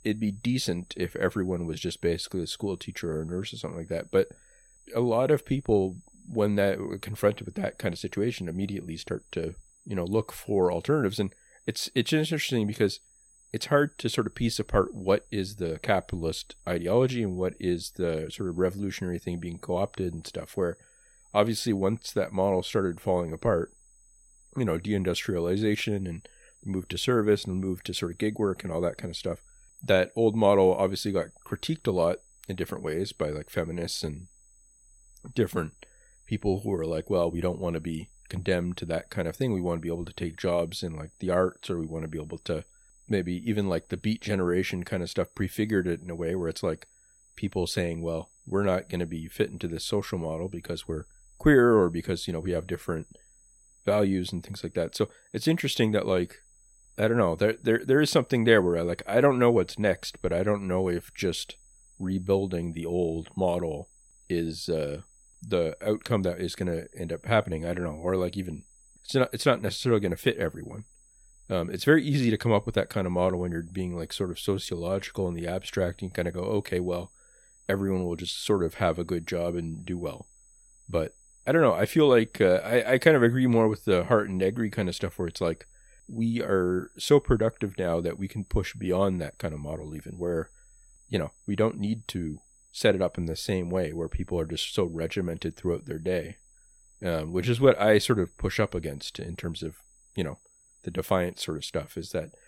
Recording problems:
high-pitched whine; faint; throughout; 8 kHz, 30 dB below the speech

